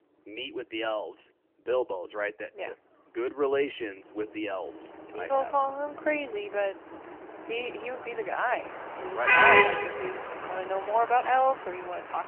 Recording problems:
phone-call audio; nothing above 3 kHz
traffic noise; very loud; throughout; 5 dB above the speech

